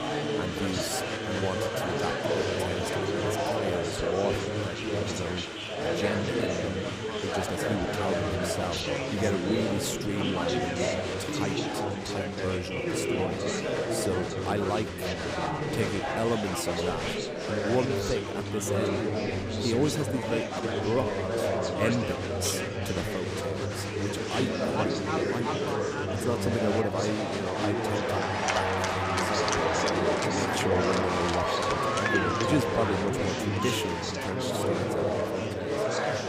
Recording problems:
chatter from many people; very loud; throughout; 4 dB above the speech

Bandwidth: 15.5 kHz